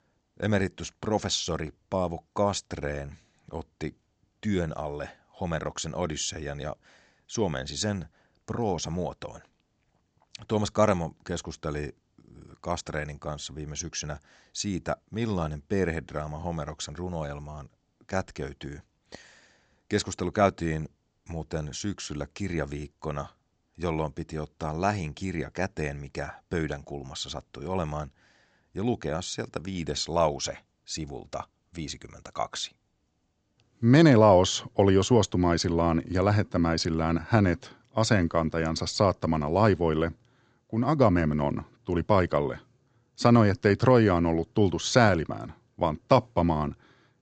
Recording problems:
high frequencies cut off; noticeable; nothing above 8 kHz

